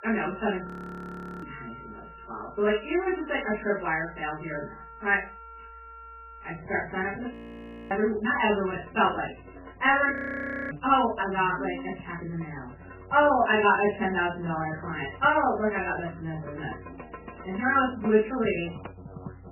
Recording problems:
off-mic speech; far
garbled, watery; badly; nothing above 3 kHz
room echo; slight; dies away in 0.3 s
background music; noticeable; throughout; 20 dB below the speech
audio freezing; at 0.5 s for 1 s, at 7.5 s for 0.5 s and at 10 s for 0.5 s

